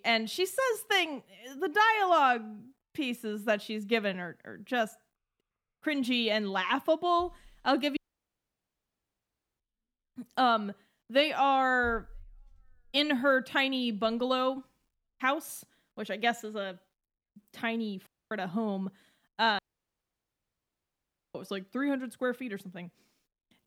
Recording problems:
audio cutting out; at 8 s for 1.5 s, at 18 s and at 20 s for 2 s

